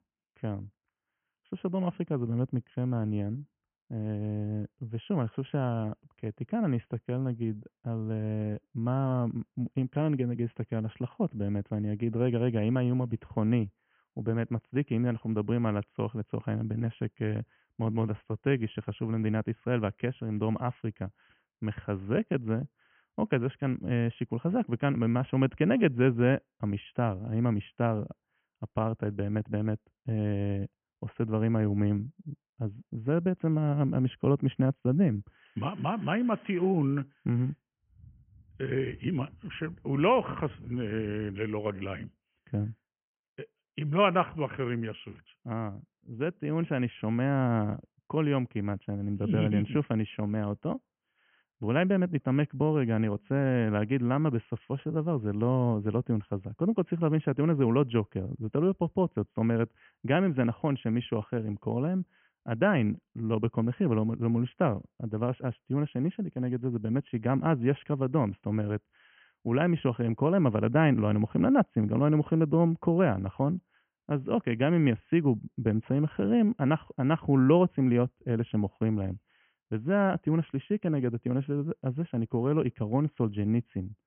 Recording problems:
high frequencies cut off; severe; nothing above 3 kHz

